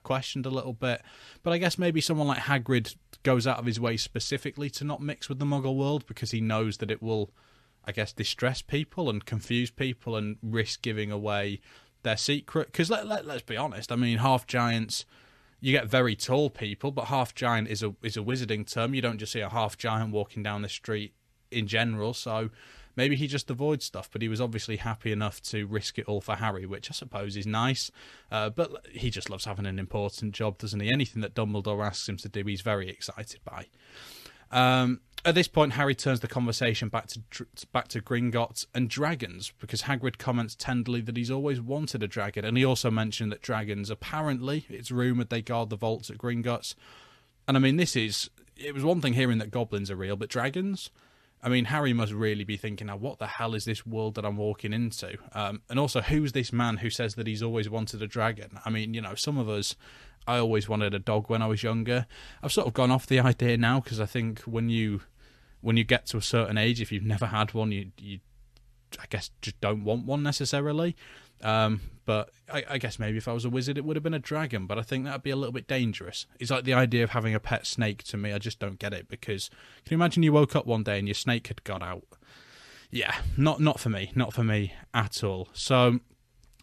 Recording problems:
none

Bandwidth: 13.5 kHz